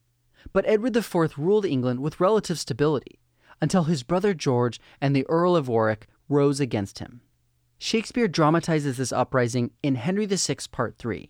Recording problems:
none

